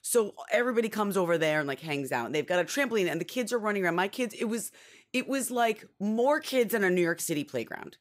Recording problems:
none

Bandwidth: 15.5 kHz